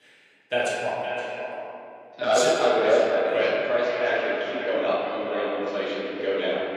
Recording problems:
echo of what is said; strong; throughout; 520 ms later, 7 dB below the speech
room echo; strong; dies away in 1.7 s
off-mic speech; far
thin; somewhat; fading below 400 Hz
uneven, jittery; slightly; from 2 to 5 s

